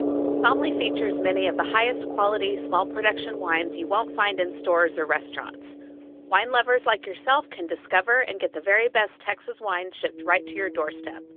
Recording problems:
phone-call audio; nothing above 3.5 kHz
background music; loud; throughout; 7 dB below the speech

